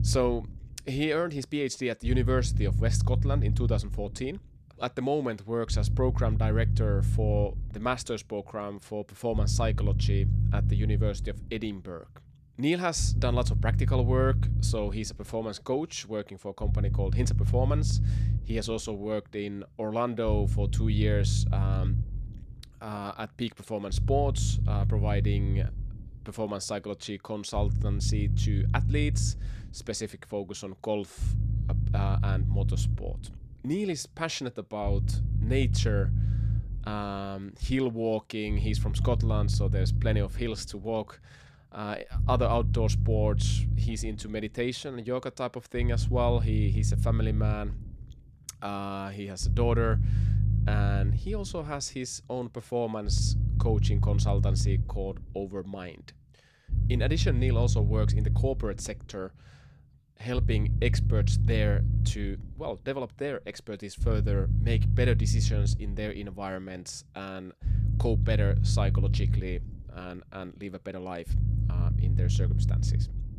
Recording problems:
low rumble; loud; throughout; 8 dB below the speech

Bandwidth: 14.5 kHz